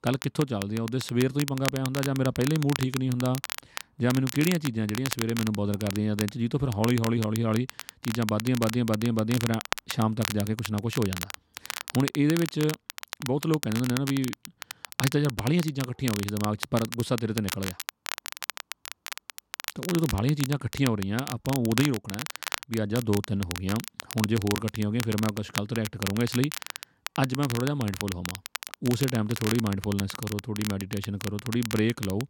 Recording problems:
crackle, like an old record; loud; 8 dB below the speech

